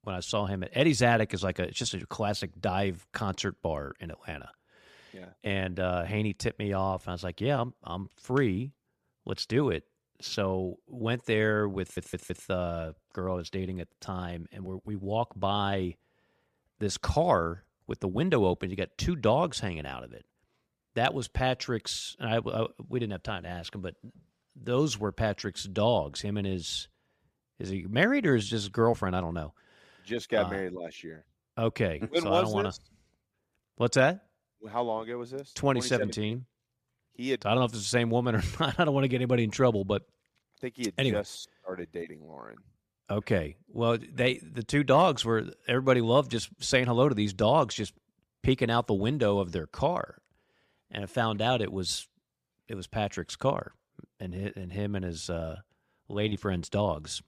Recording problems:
audio stuttering; at 12 s

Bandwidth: 14.5 kHz